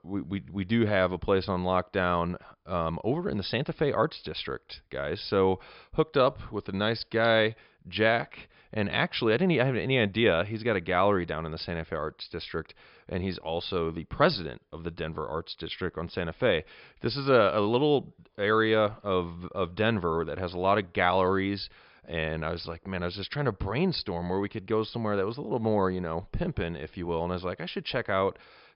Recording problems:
high frequencies cut off; noticeable; nothing above 5.5 kHz

